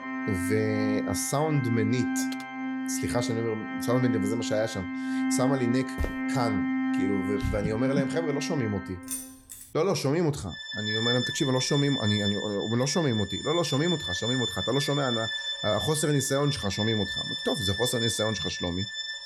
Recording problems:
background music; loud; throughout; 2 dB below the speech
keyboard typing; faint; at 2.5 s; peak 20 dB below the speech
footsteps; noticeable; at 6 s; peak 7 dB below the speech
jangling keys; noticeable; at 9 s; peak 6 dB below the speech

